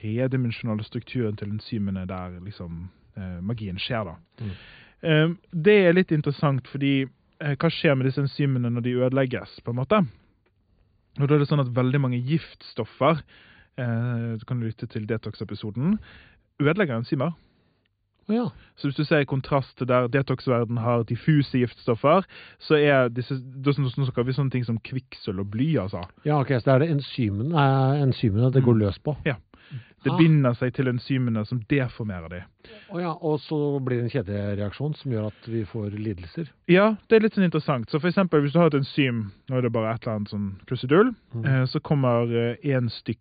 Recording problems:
high frequencies cut off; severe; nothing above 4.5 kHz

